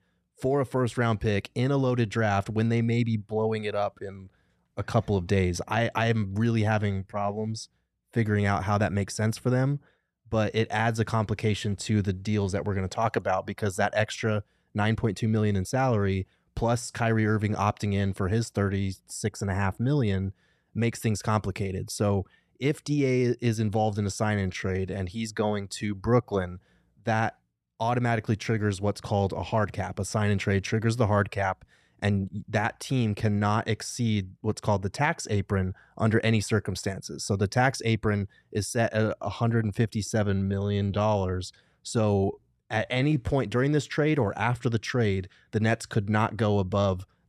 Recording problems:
uneven, jittery; strongly; from 6.5 to 43 s

